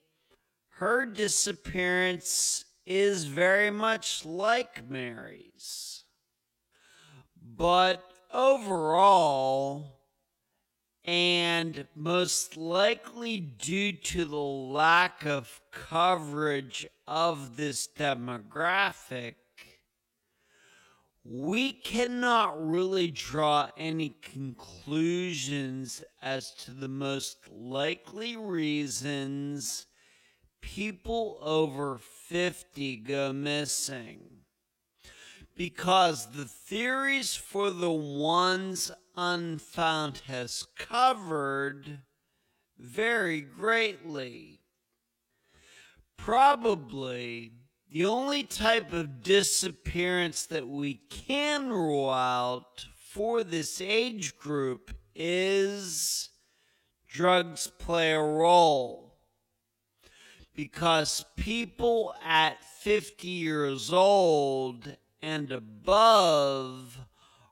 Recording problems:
wrong speed, natural pitch; too slow; 0.5 times normal speed

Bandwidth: 16.5 kHz